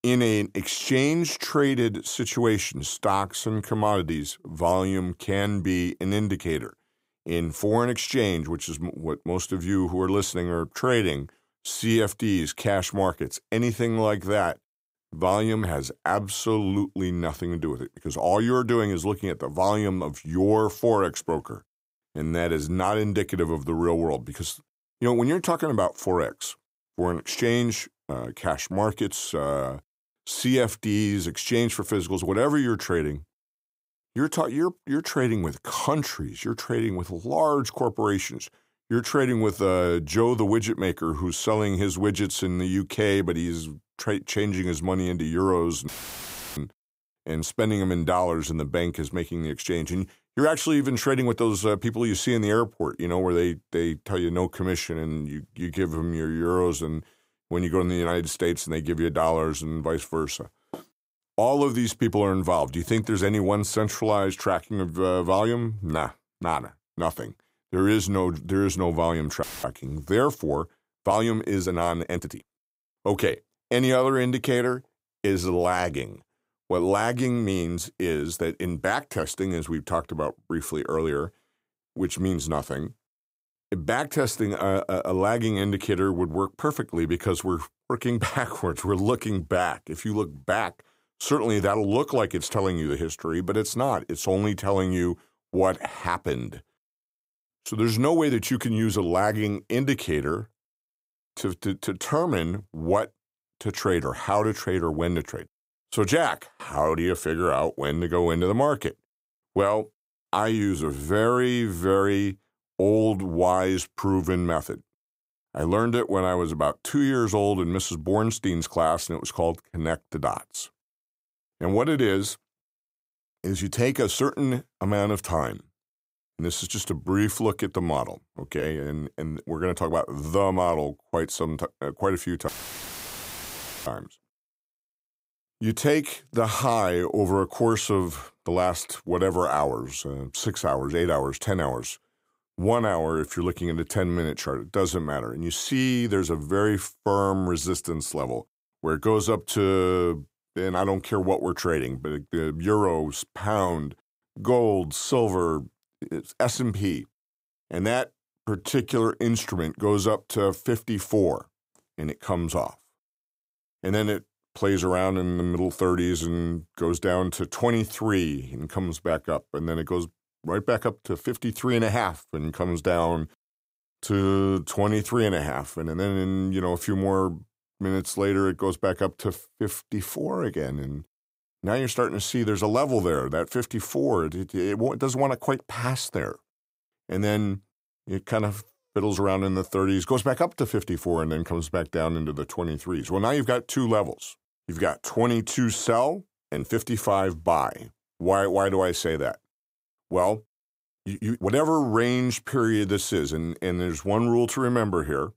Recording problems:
audio cutting out; filled with static; at 46 s for 0.5 s, at 1:09 and at 2:12 for 1.5 s
uneven, jittery; strongly; from 55 s to 3:22

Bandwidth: 15.5 kHz